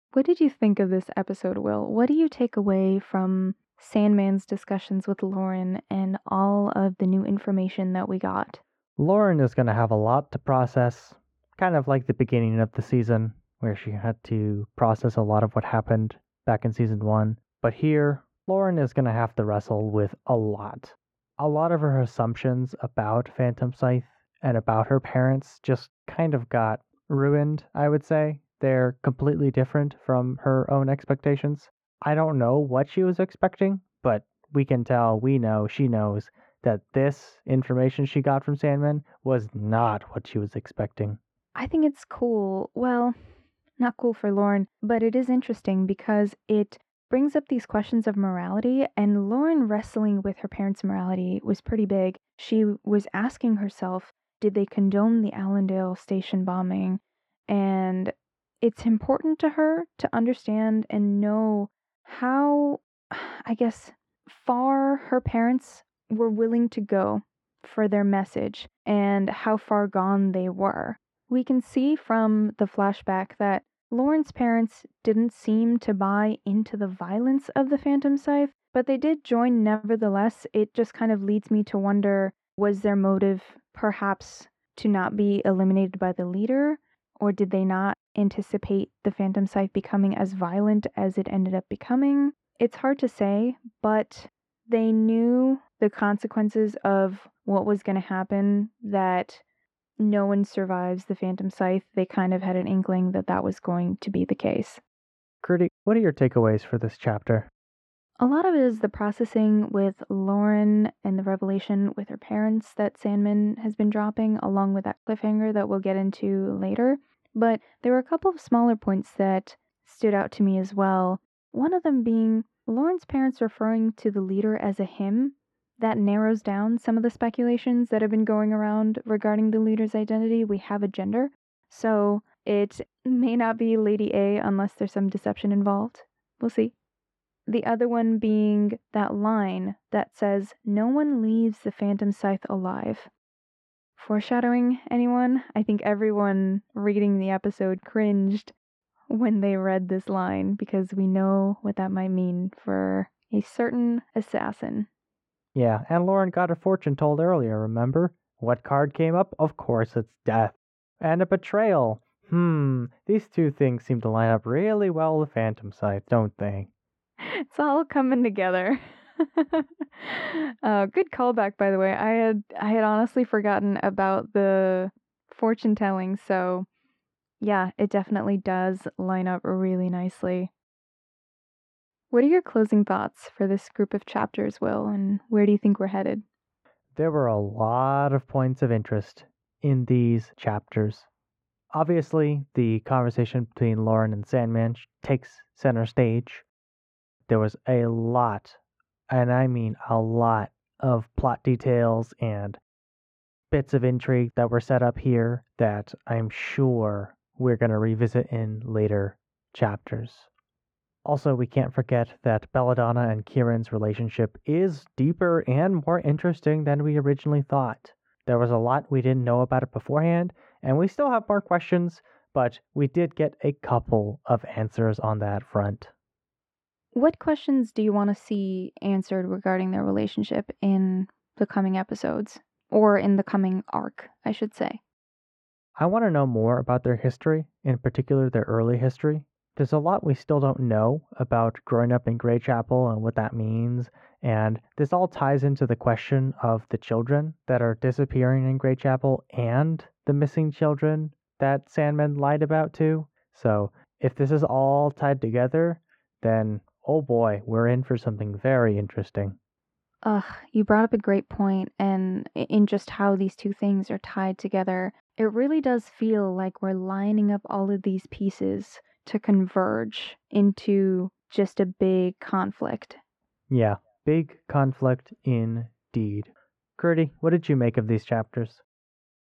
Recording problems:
muffled; very; fading above 4 kHz

